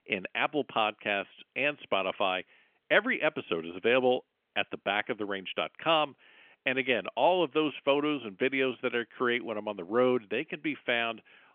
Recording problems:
phone-call audio; nothing above 3.5 kHz

